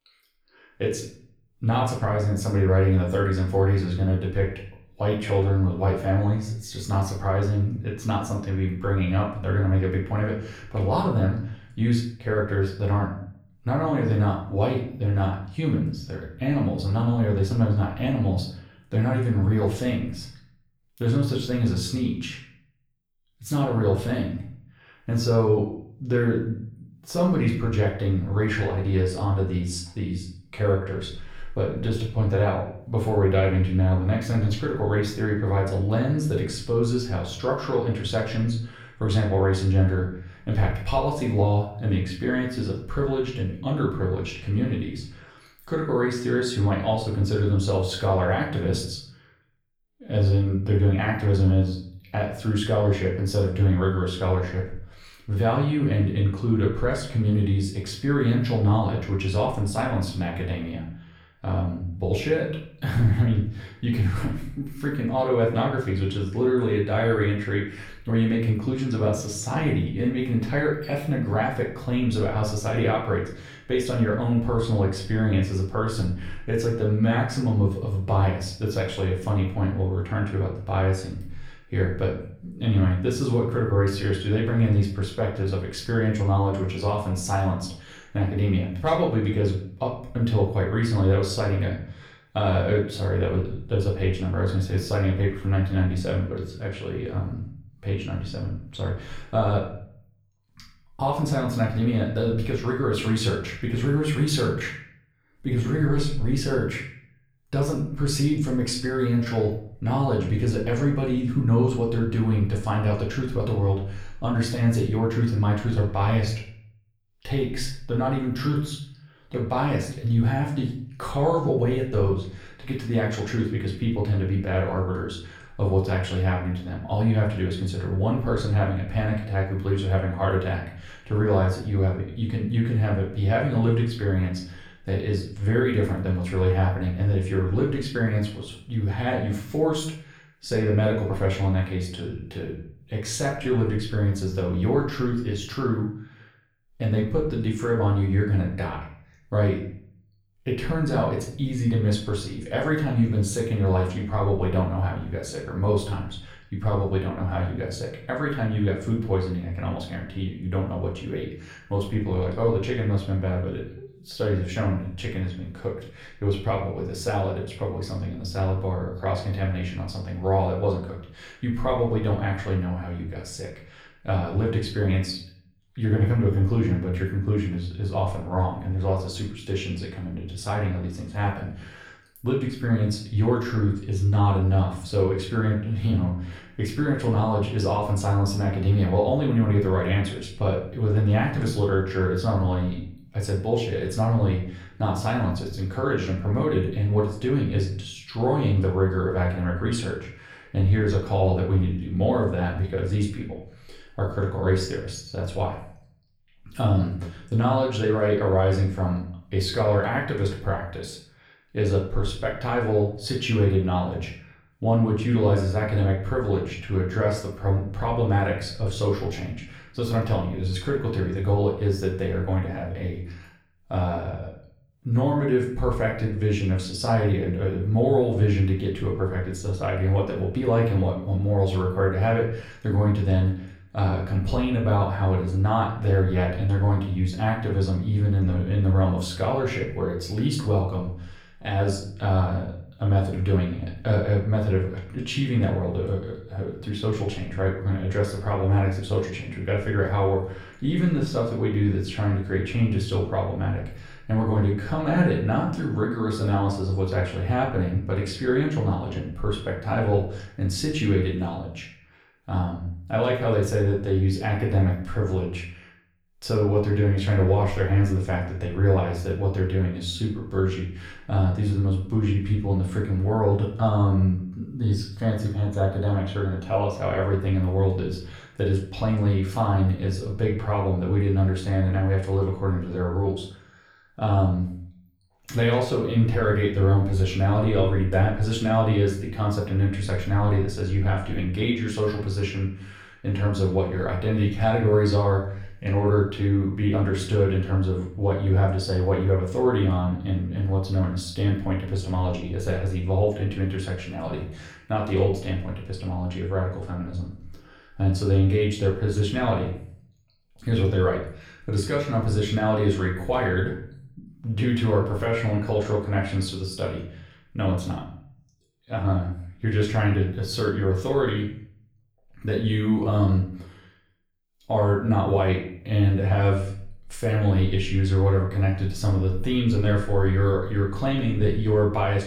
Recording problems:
off-mic speech; far
room echo; slight; dies away in 0.5 s

